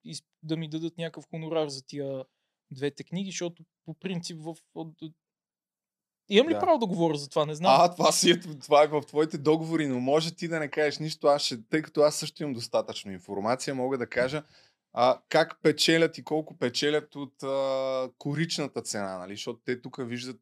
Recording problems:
none

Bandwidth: 13.5 kHz